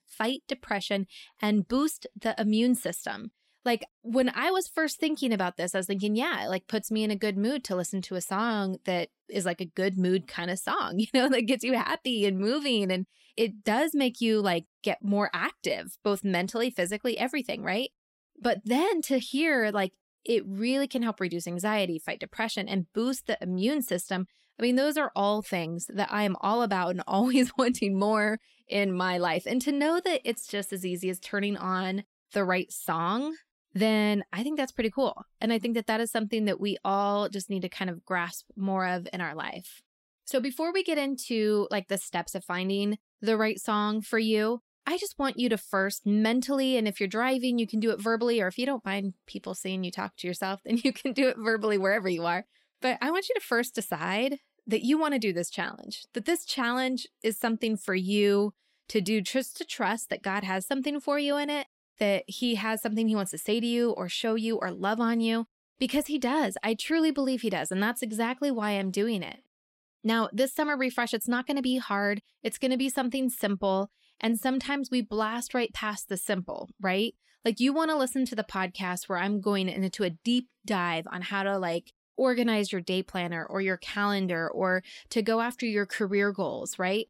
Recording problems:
none

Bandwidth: 16 kHz